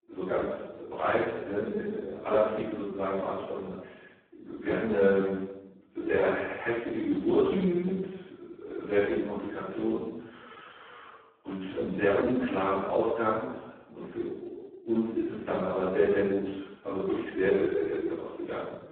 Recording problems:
phone-call audio; poor line; nothing above 4 kHz
off-mic speech; far
room echo; noticeable; dies away in 1 s

